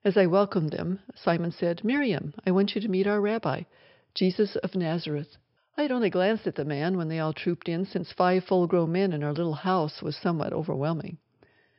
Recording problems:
high frequencies cut off; noticeable; nothing above 5.5 kHz

